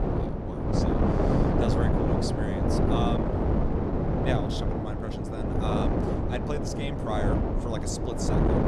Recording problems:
wind noise on the microphone; heavy; 5 dB above the speech

